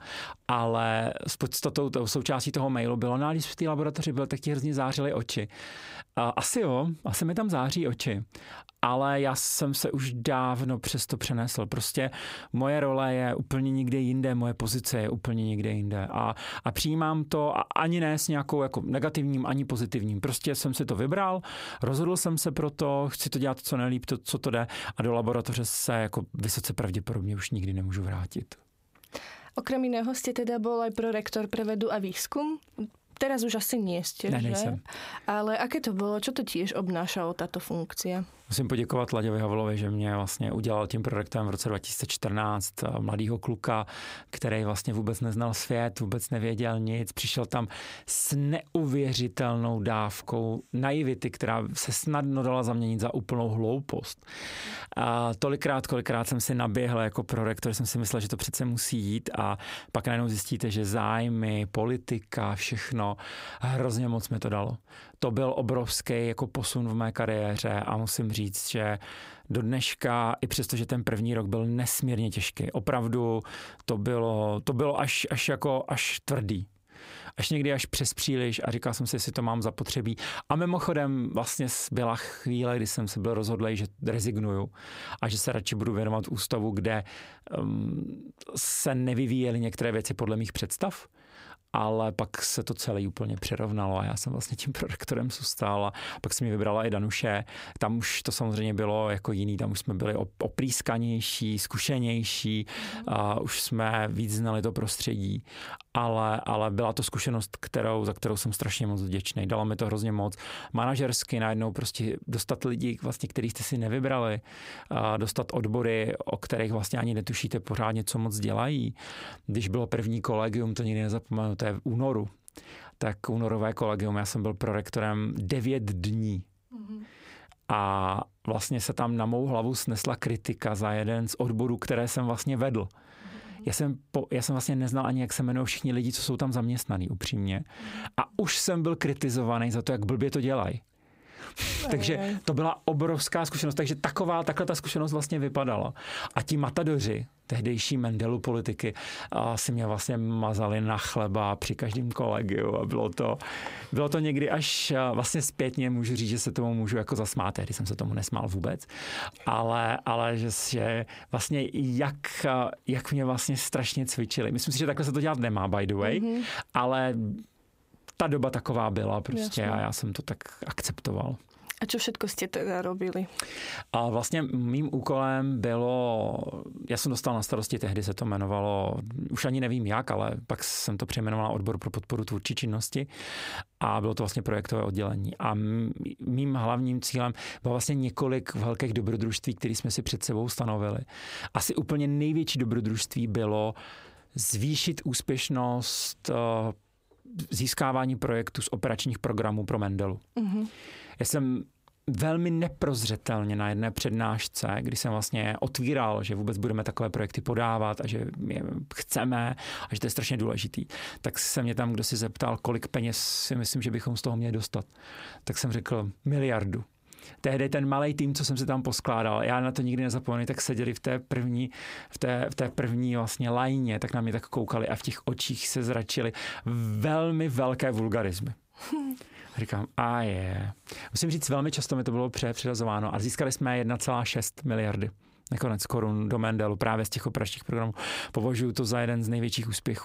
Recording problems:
squashed, flat; heavily

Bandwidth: 15.5 kHz